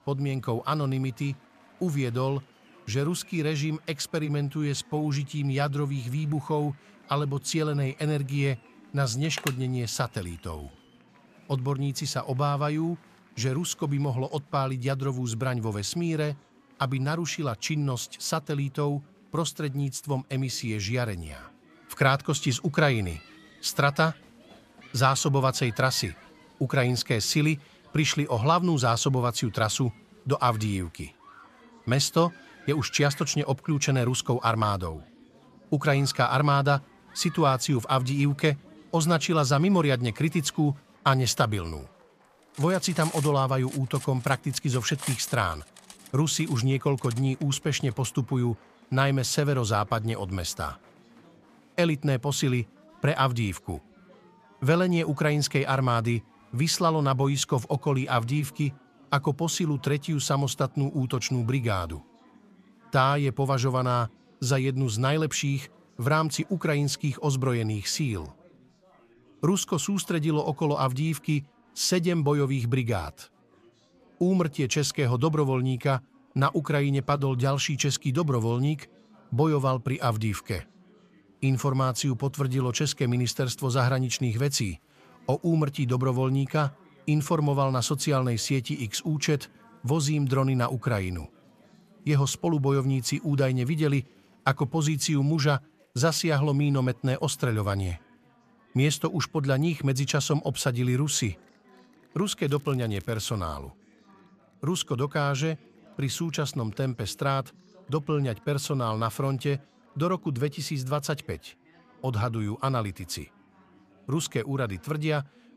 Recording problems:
chatter from many people; faint; throughout; 30 dB below the speech
crackling; faint; at 1:42; 25 dB below the speech
phone ringing; noticeable; at 9 s; peak 8 dB below the speech
clattering dishes; noticeable; from 43 to 48 s; peak 8 dB below the speech

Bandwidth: 14.5 kHz